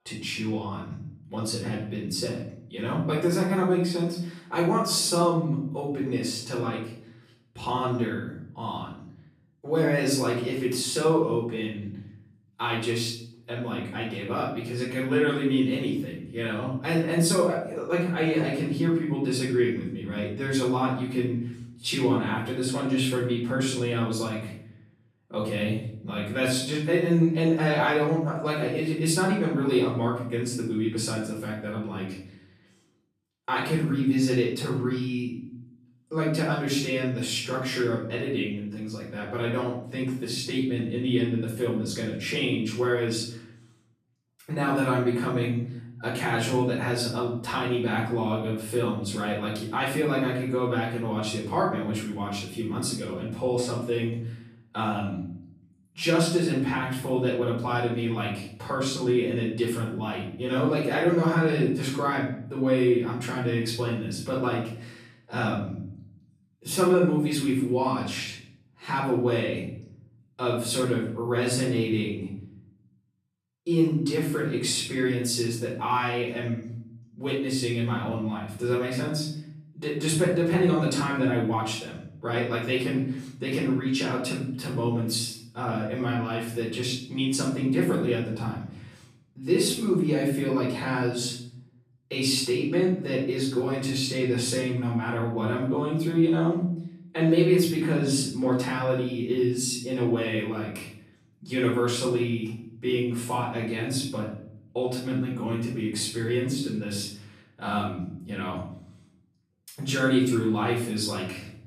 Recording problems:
off-mic speech; far
room echo; noticeable; dies away in 0.7 s

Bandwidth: 14.5 kHz